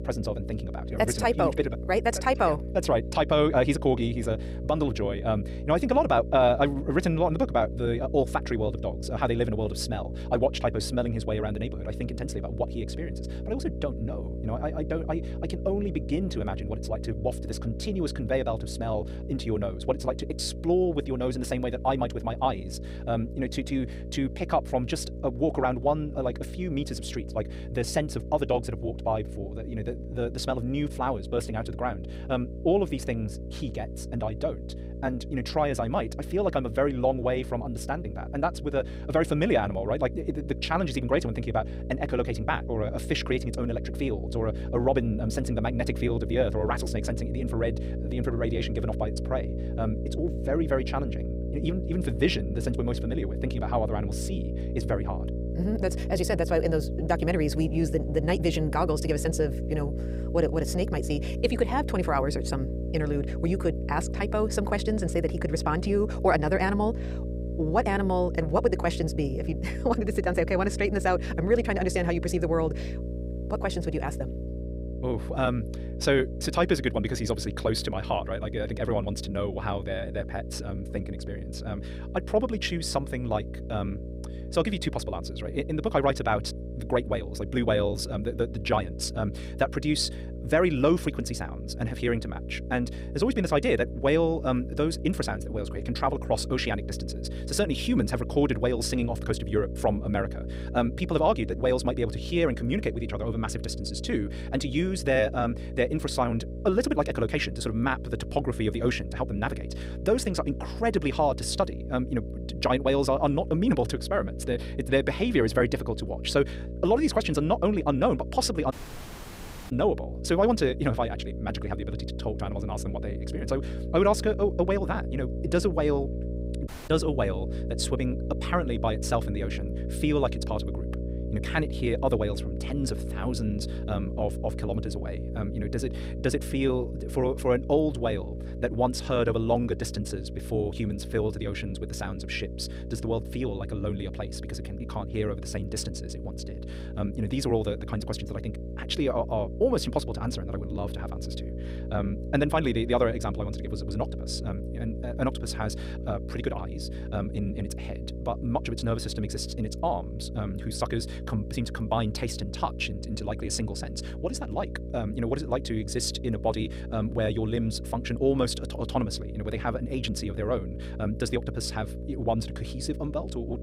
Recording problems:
wrong speed, natural pitch; too fast; 1.6 times normal speed
electrical hum; noticeable; throughout; 60 Hz, 15 dB below the speech
audio cutting out; at 1:59 for 1 s and at 2:07

